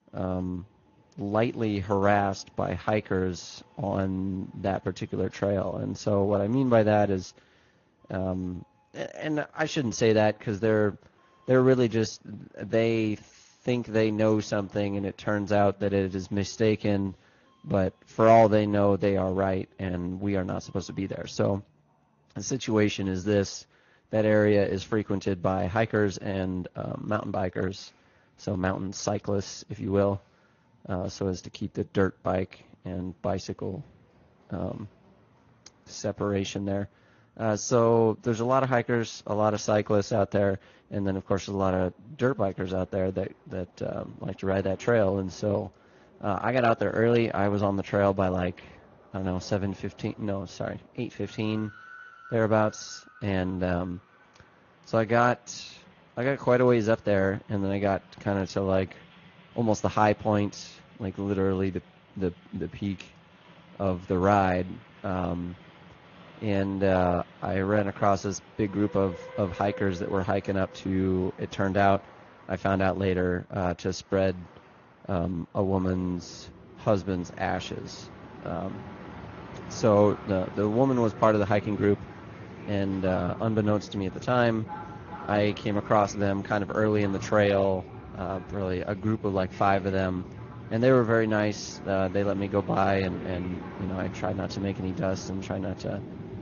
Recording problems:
garbled, watery; slightly; nothing above 6.5 kHz
train or aircraft noise; noticeable; throughout; 15 dB below the speech

